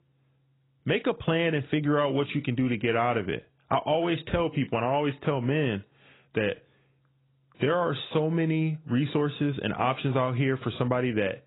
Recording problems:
garbled, watery; badly; nothing above 4 kHz

